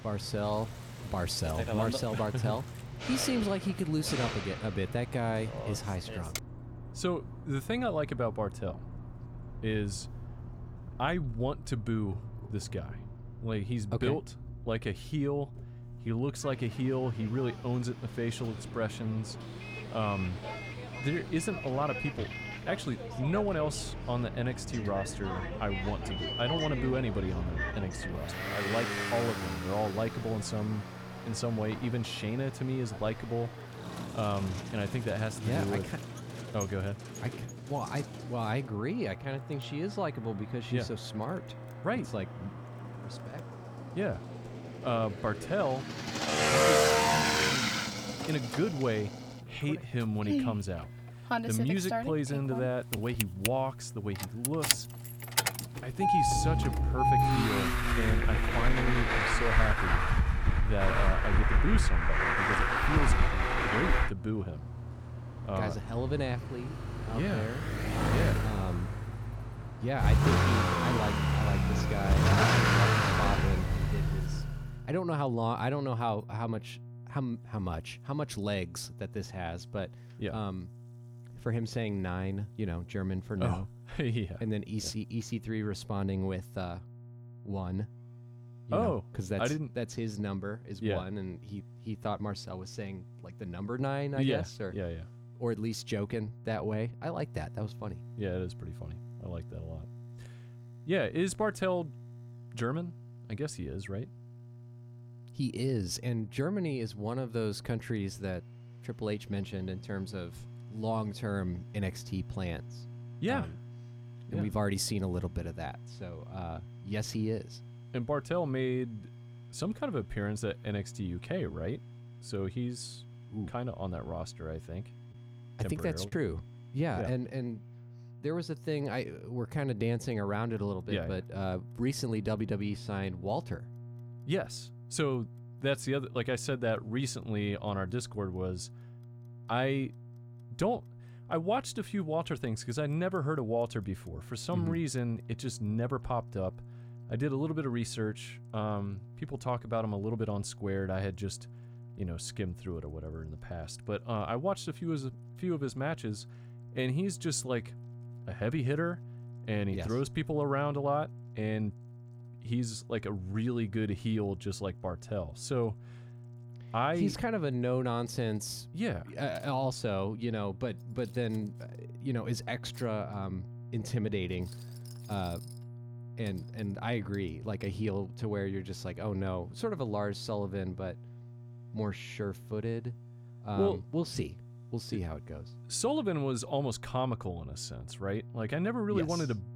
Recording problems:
traffic noise; very loud; until 1:14; 3 dB above the speech
electrical hum; faint; throughout; 60 Hz, 20 dB below the speech
household noises; faint; throughout; 25 dB below the speech
choppy; occasionally; at 2:06; 2% of the speech affected

